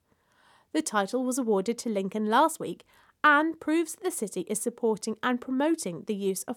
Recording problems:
none

